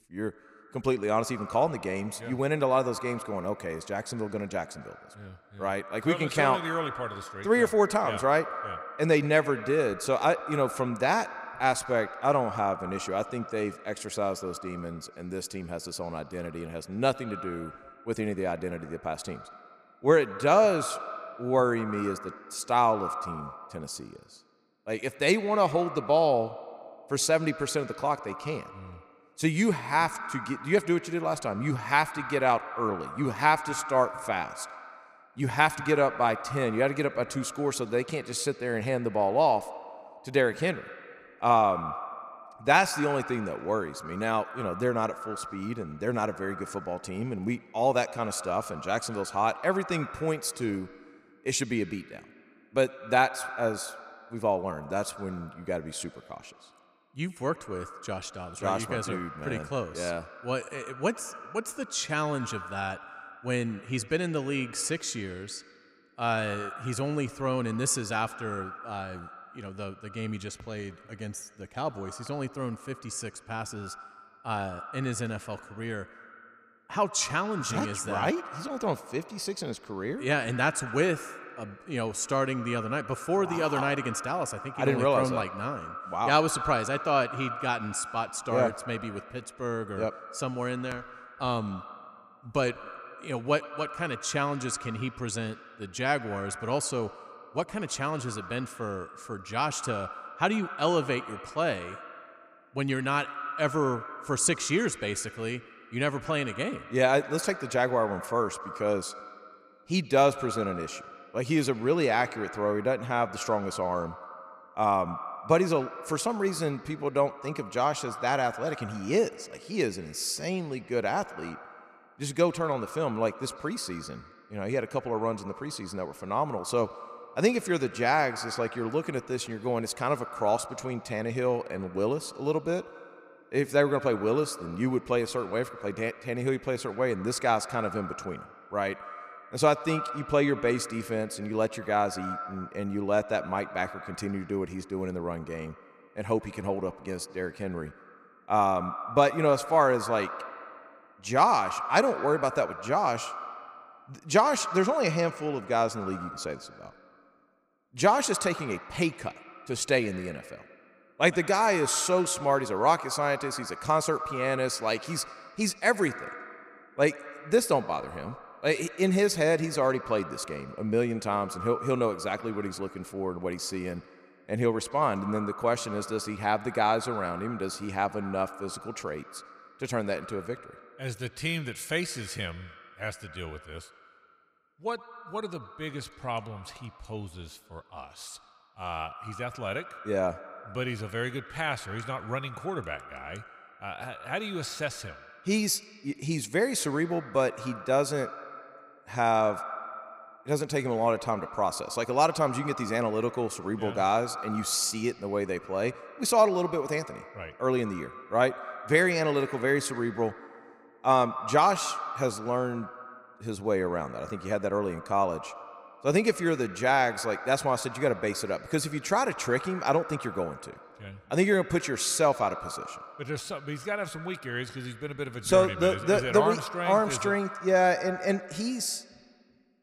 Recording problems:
echo of what is said; noticeable; throughout; 100 ms later, 15 dB below the speech

